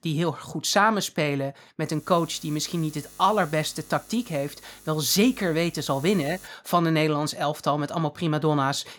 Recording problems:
electrical hum; faint; from 2 to 6.5 s; 50 Hz, 25 dB below the speech

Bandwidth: 18 kHz